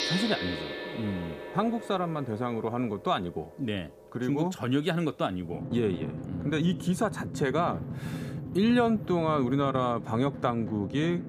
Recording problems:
background music; loud; throughout; 8 dB below the speech

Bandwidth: 15 kHz